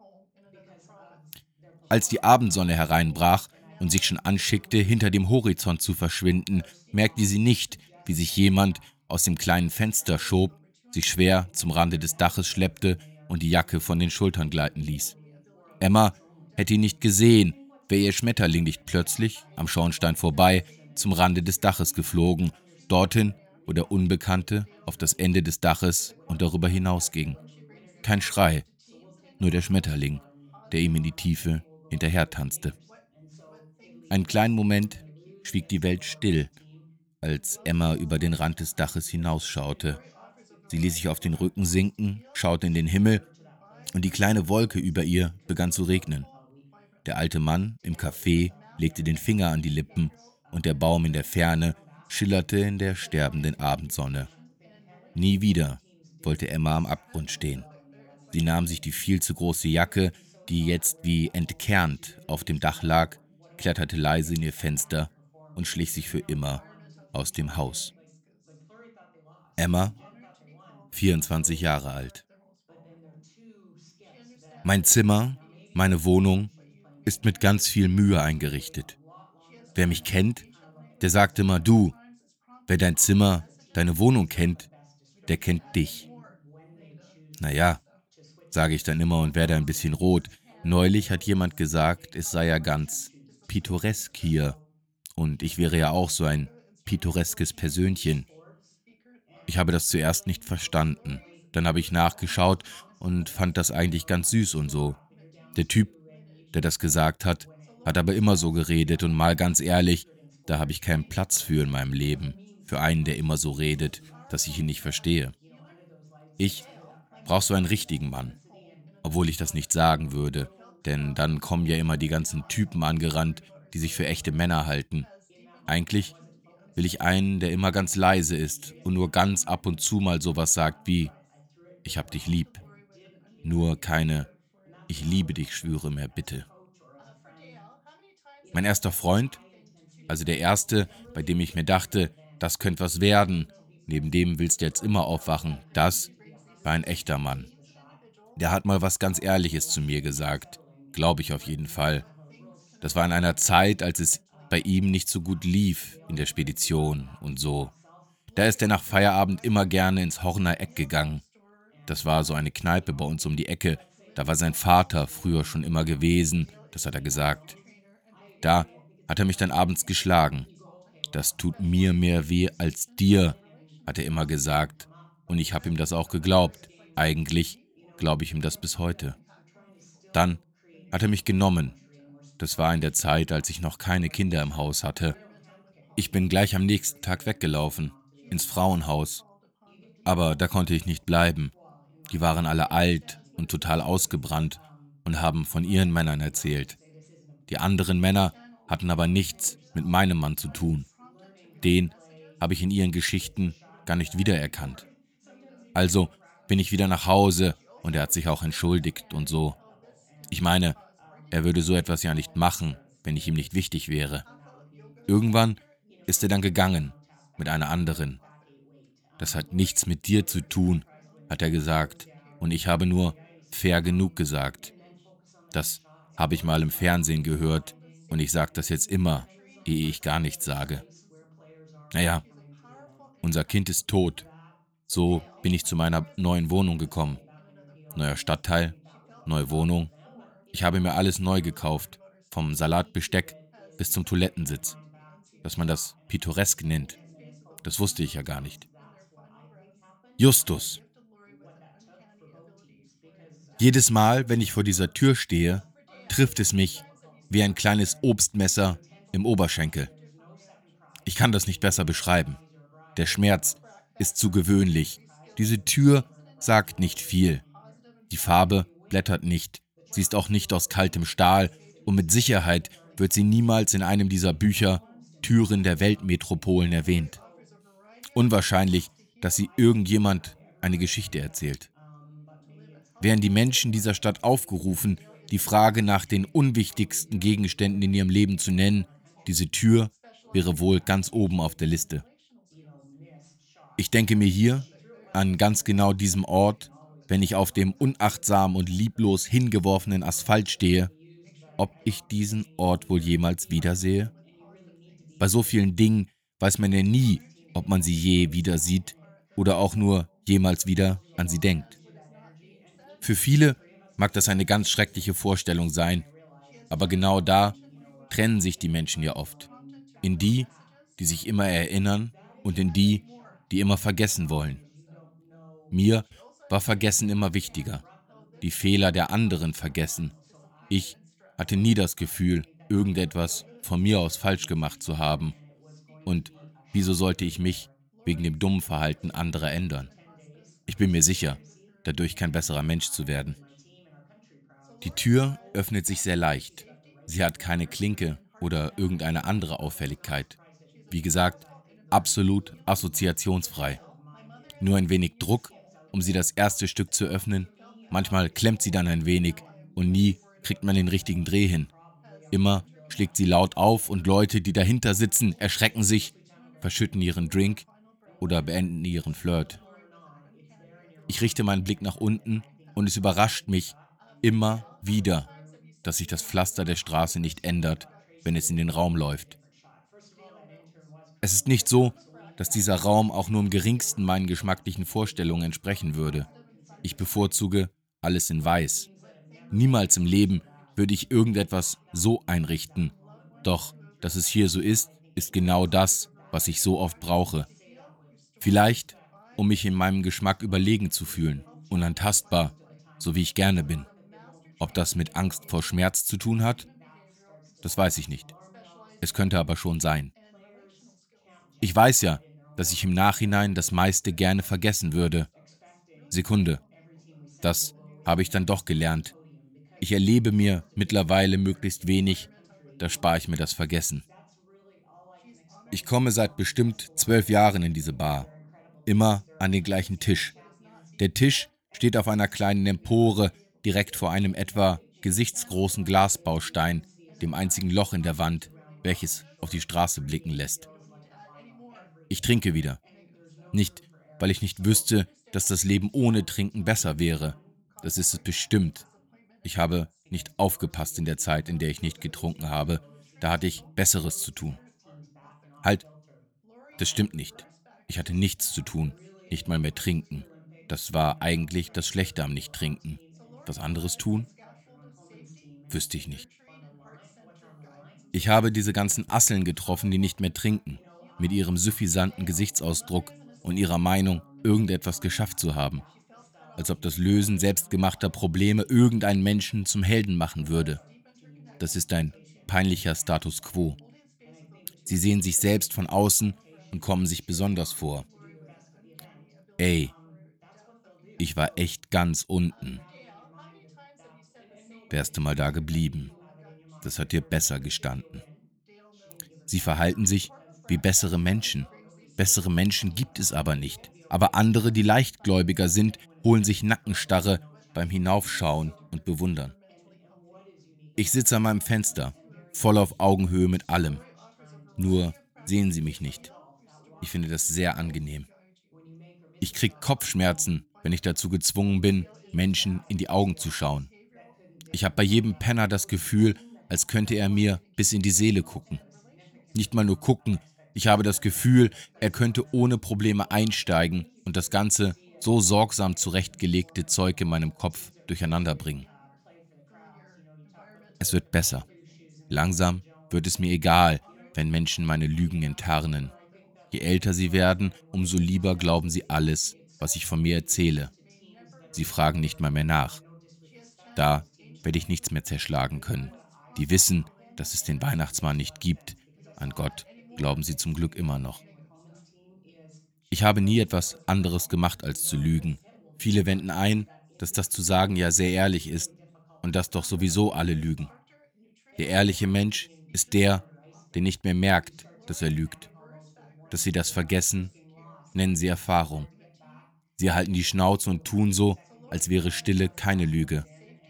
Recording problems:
background chatter; faint; throughout; 2 voices, 30 dB below the speech

